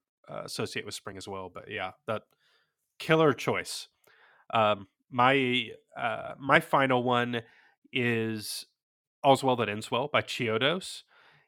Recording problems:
uneven, jittery; strongly; from 1 to 11 s

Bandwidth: 17 kHz